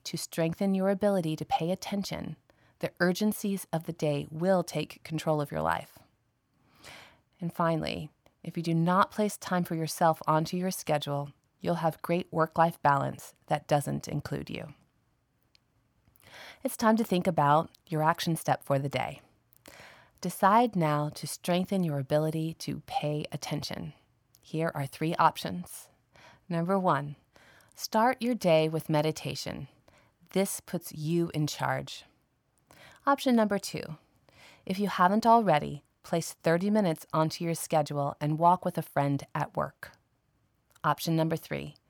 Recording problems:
none

